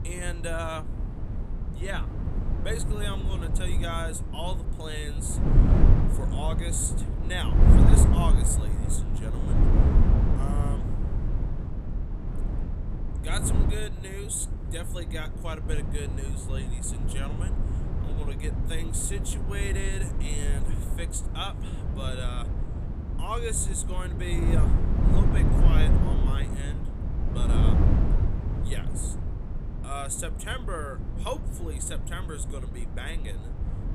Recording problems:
wind noise on the microphone; heavy; 3 dB below the speech

